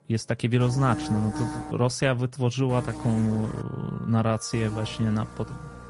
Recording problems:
garbled, watery; slightly; nothing above 11 kHz
electrical hum; loud; from 0.5 to 1.5 s, at 2.5 s and from 4.5 s on; 60 Hz, 8 dB below the speech
background music; faint; throughout; 20 dB below the speech

